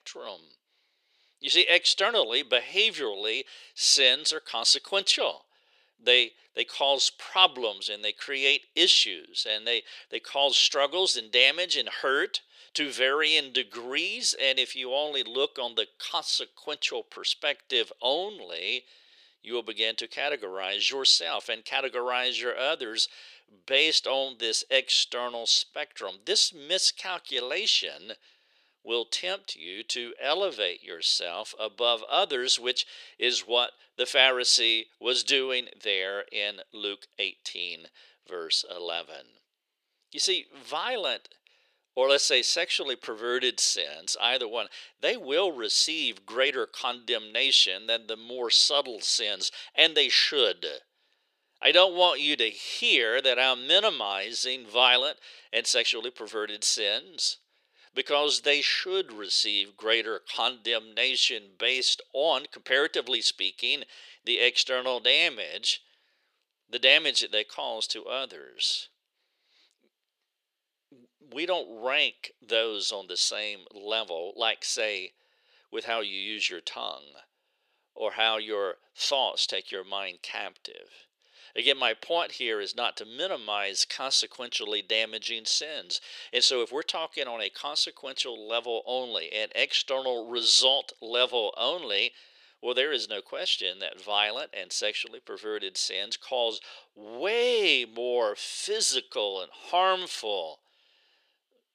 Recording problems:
thin; very; fading below 400 Hz

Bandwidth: 14.5 kHz